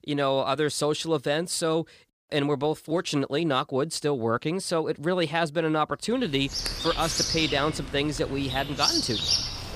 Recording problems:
animal sounds; loud; from 6.5 s on; 1 dB below the speech

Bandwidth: 15 kHz